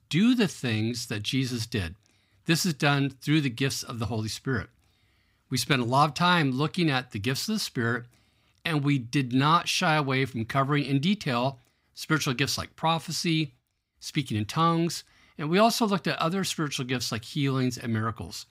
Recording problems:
none

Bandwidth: 15.5 kHz